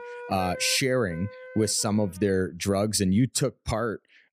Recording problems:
background music; noticeable; until 1.5 s; 15 dB below the speech

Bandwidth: 15.5 kHz